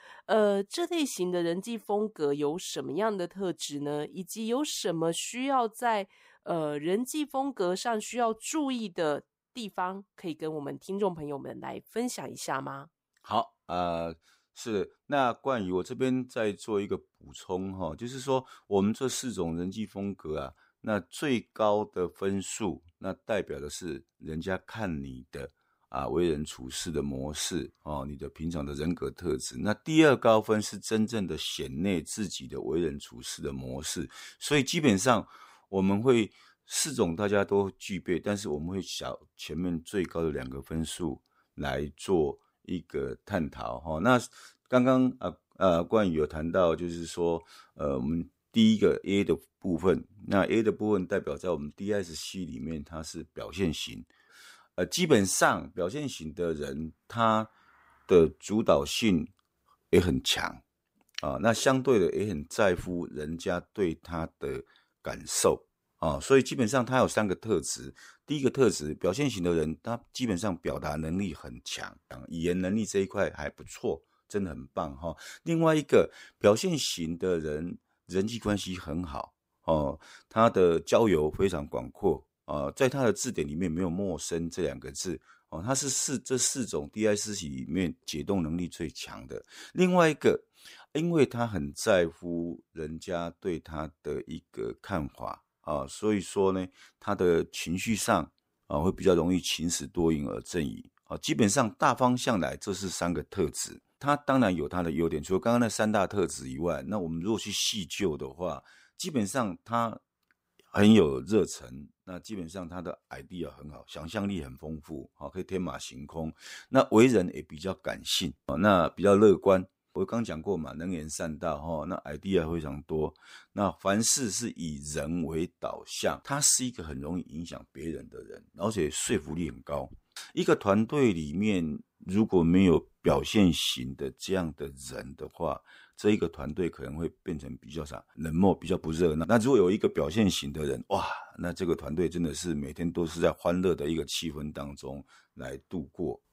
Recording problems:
none

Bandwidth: 15.5 kHz